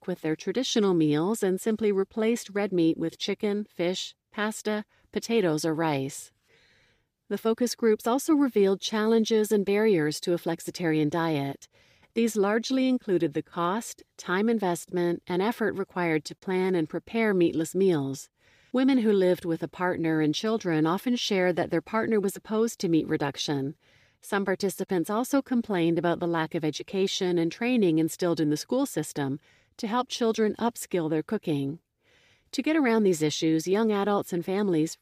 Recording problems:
none

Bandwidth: 15 kHz